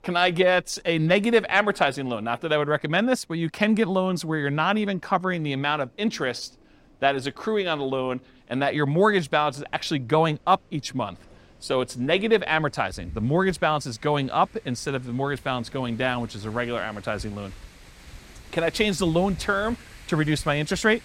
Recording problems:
wind in the background; faint; throughout; 25 dB below the speech

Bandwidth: 16 kHz